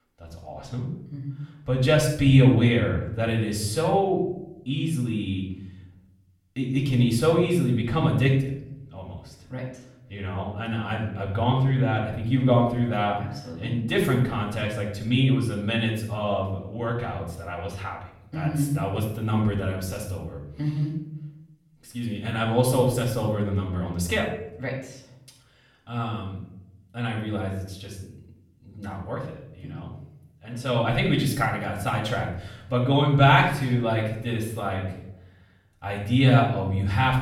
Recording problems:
off-mic speech; far
room echo; noticeable; dies away in 0.7 s

